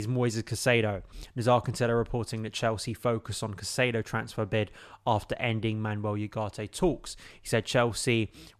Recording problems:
abrupt cut into speech; at the start

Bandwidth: 13.5 kHz